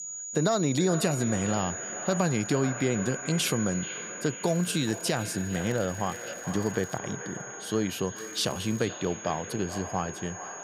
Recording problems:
echo of what is said; strong; throughout; 430 ms later, 10 dB below the speech
high-pitched whine; loud; throughout; 7 kHz, 9 dB below the speech
crackling; faint; from 4.5 to 7 s and at 8 s; 25 dB below the speech

